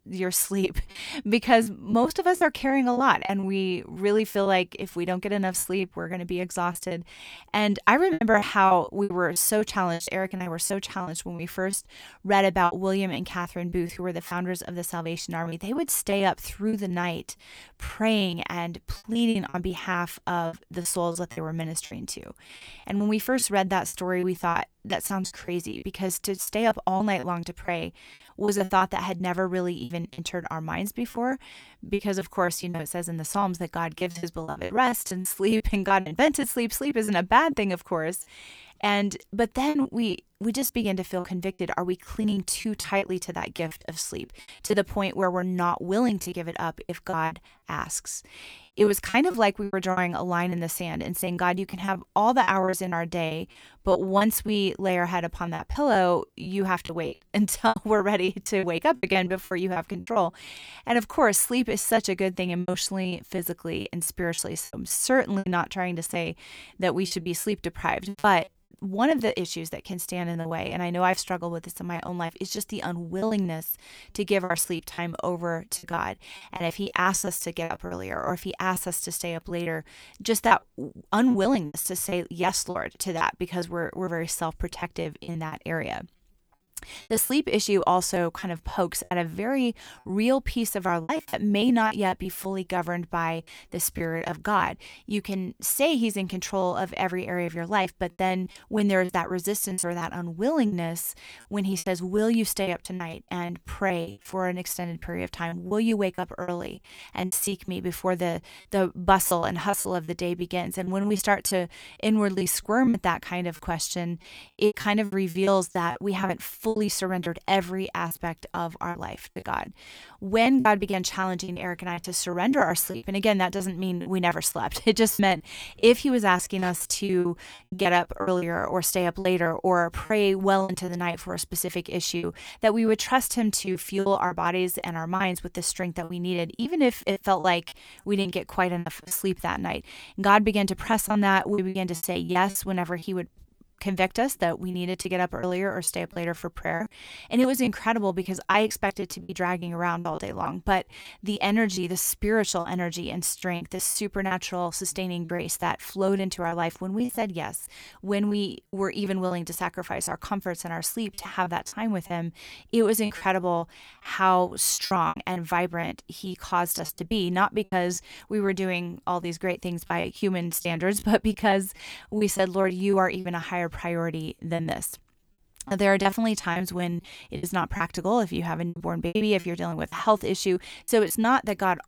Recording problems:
choppy; very; 12% of the speech affected

